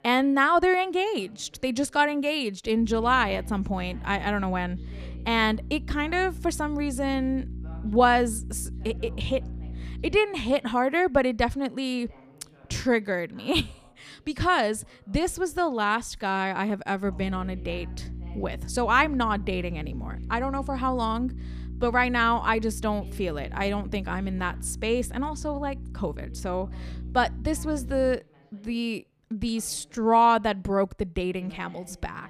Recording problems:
electrical hum; faint; from 3 to 10 s and from 17 to 28 s; 60 Hz, 25 dB below the speech
voice in the background; faint; throughout; 30 dB below the speech

